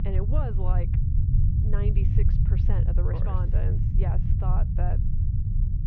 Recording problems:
muffled; very; fading above 3 kHz
low rumble; loud; throughout; 1 dB below the speech

